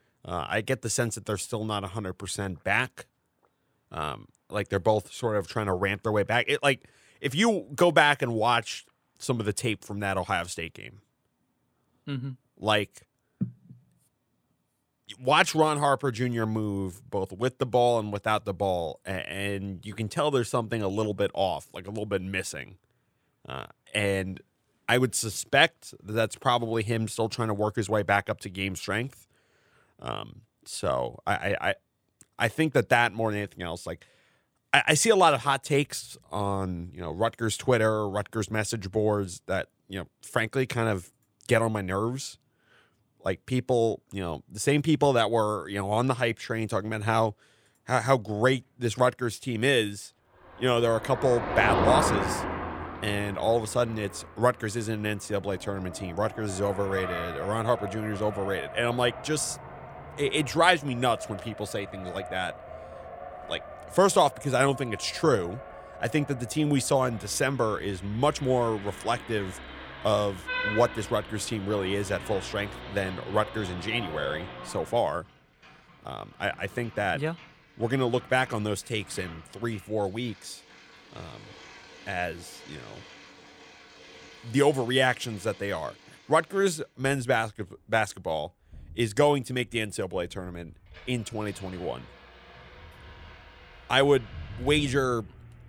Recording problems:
traffic noise; noticeable; from 50 s on; 10 dB below the speech

